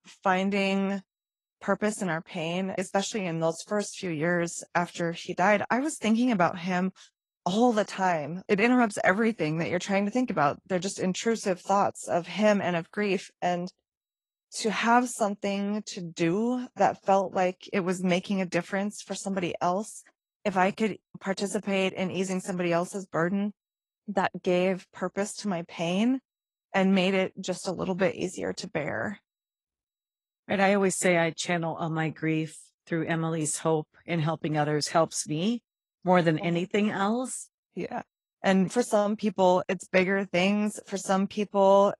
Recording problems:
garbled, watery; slightly

